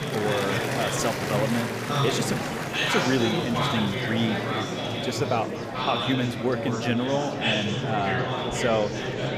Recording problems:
murmuring crowd; very loud; throughout; 1 dB above the speech

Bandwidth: 15 kHz